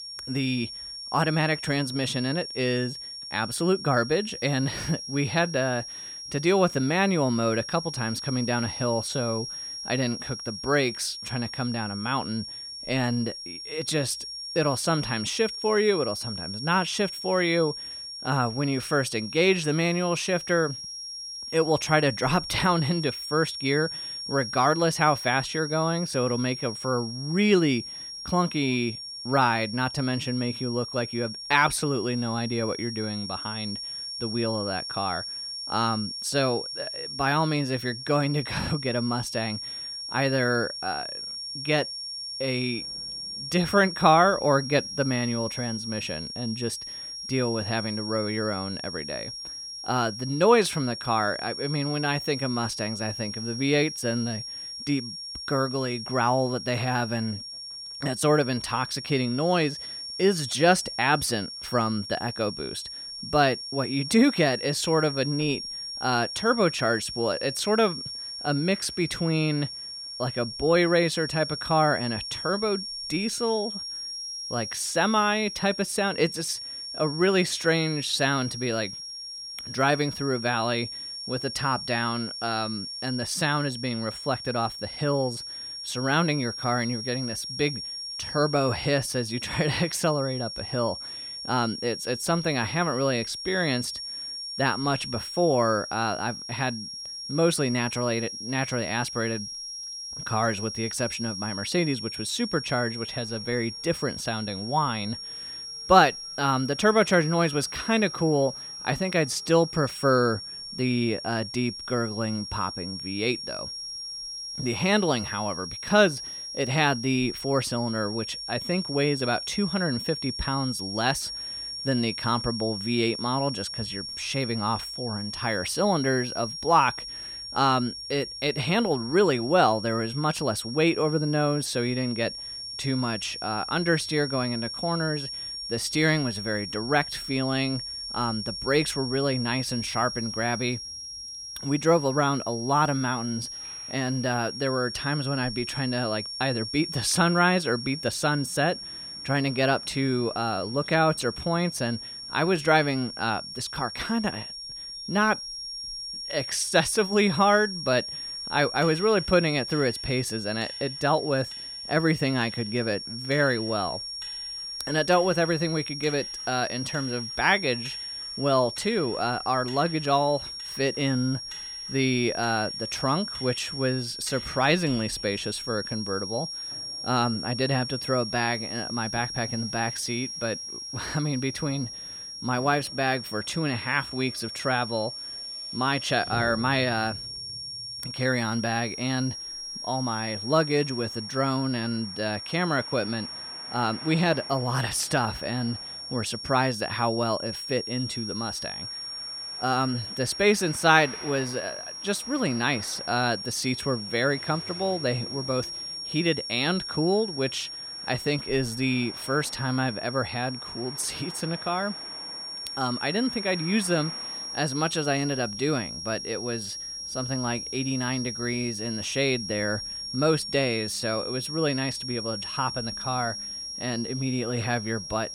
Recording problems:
high-pitched whine; loud; throughout; 5.5 kHz, 7 dB below the speech
traffic noise; faint; throughout; 25 dB below the speech

